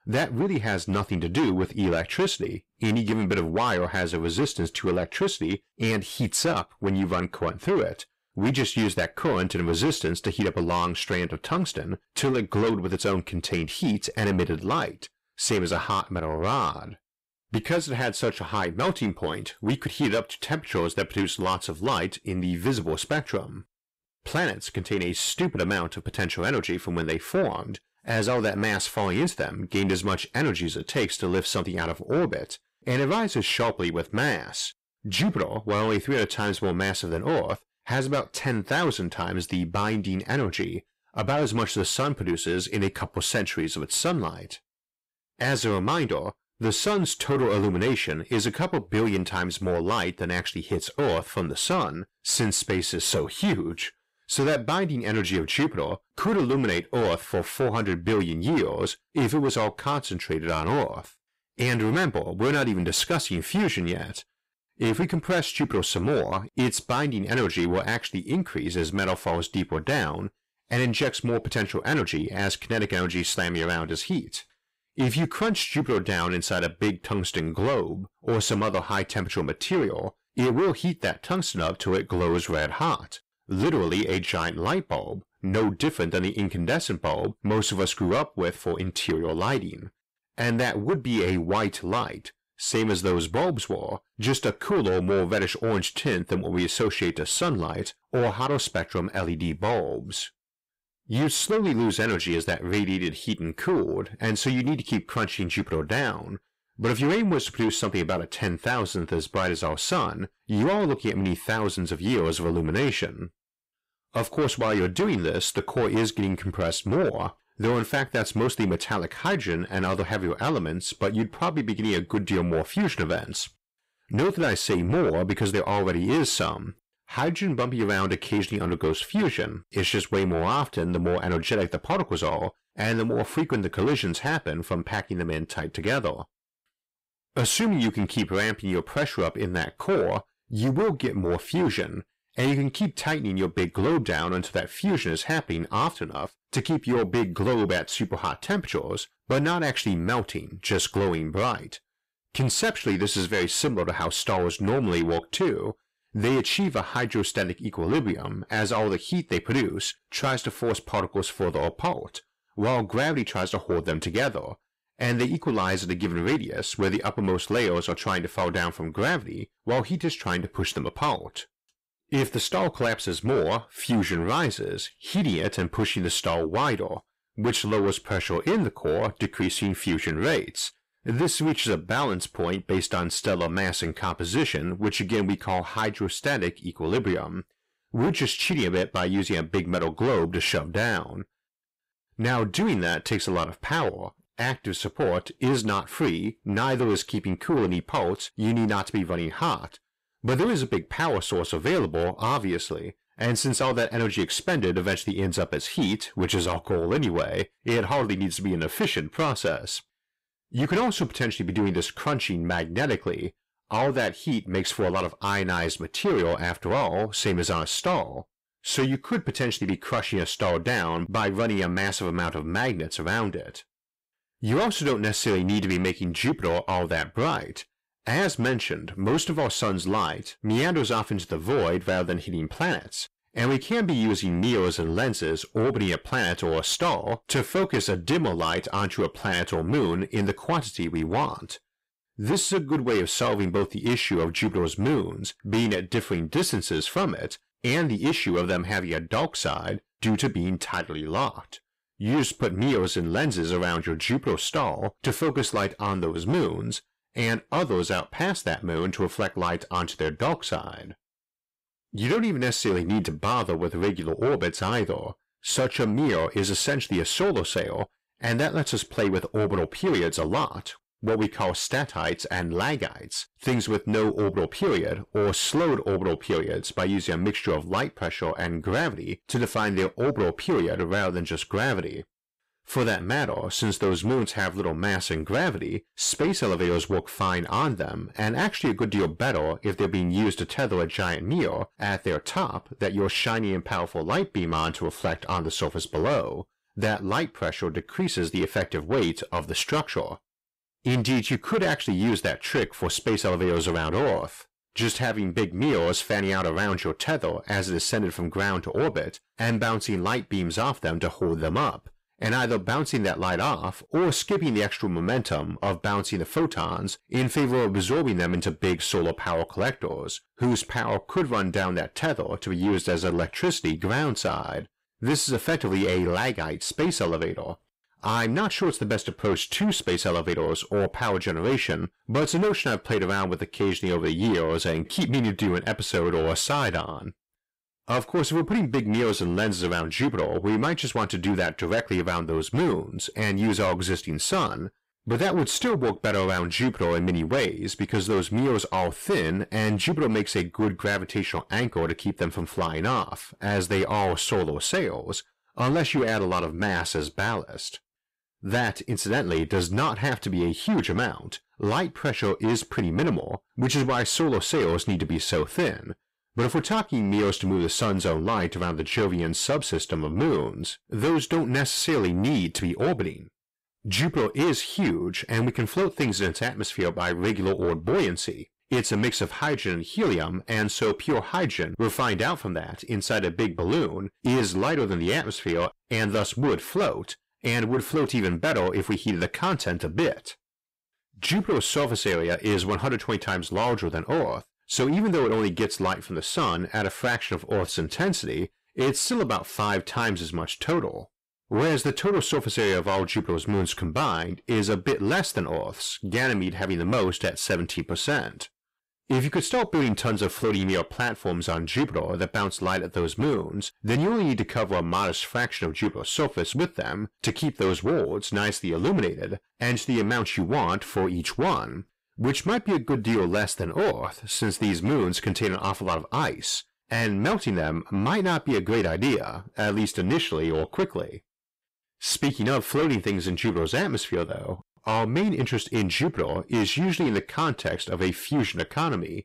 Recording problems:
distortion; heavy; 8 dB below the speech

